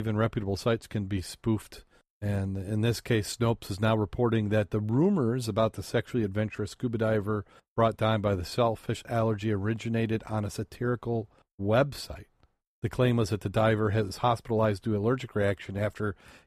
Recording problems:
abrupt cut into speech; at the start

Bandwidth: 14.5 kHz